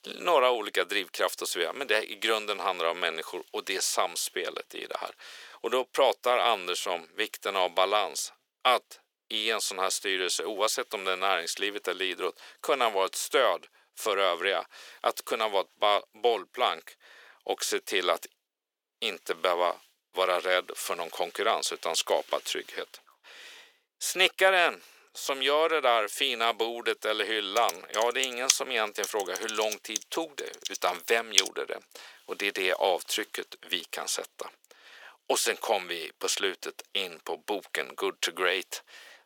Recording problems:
thin; very; fading below 400 Hz
keyboard typing; loud; from 28 to 31 s; peak 3 dB above the speech

